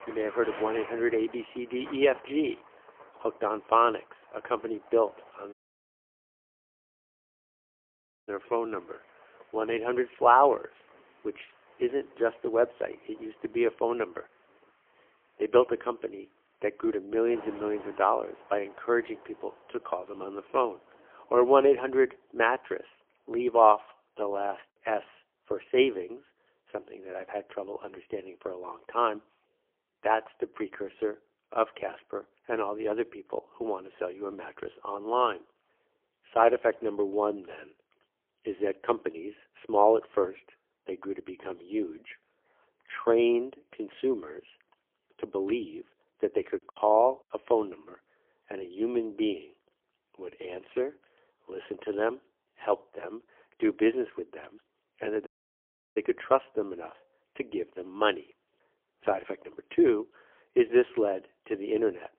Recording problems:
phone-call audio; poor line; nothing above 3.5 kHz
rain or running water; faint; throughout; 20 dB below the speech
audio cutting out; at 5.5 s for 2.5 s and at 55 s for 0.5 s
choppy; occasionally; at 47 s; 4% of the speech affected

